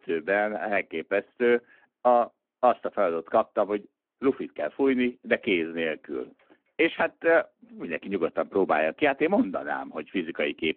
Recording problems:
phone-call audio

